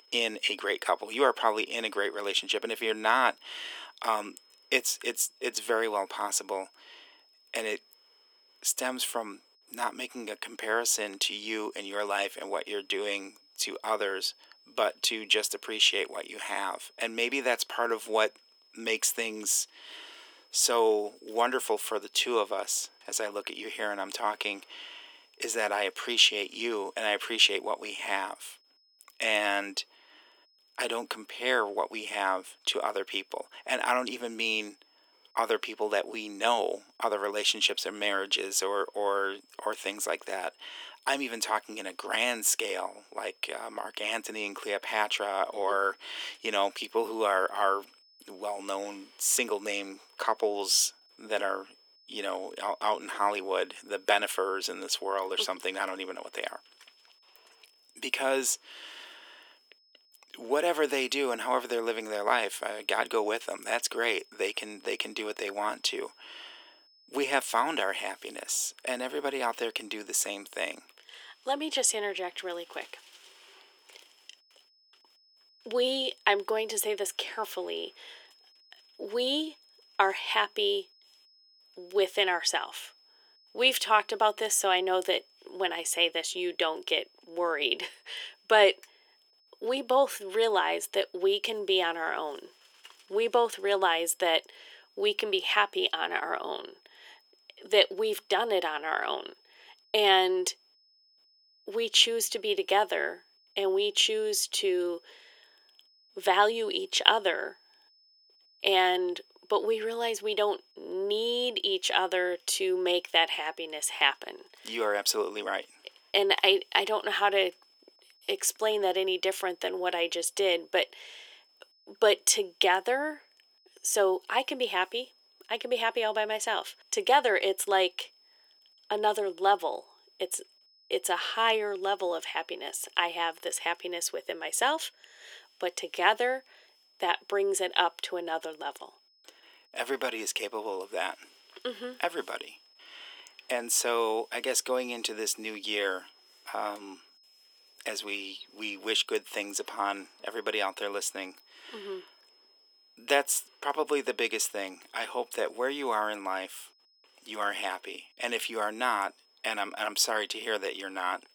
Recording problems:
thin; very; fading below 350 Hz
high-pitched whine; faint; throughout; 5 kHz, 30 dB below the speech

